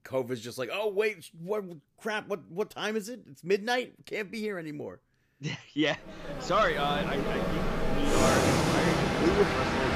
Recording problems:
train or aircraft noise; very loud; from 6.5 s on; 3 dB above the speech

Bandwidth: 15 kHz